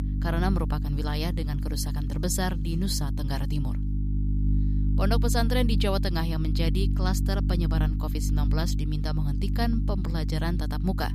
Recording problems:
electrical hum; loud; throughout; 50 Hz, 8 dB below the speech

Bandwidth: 15 kHz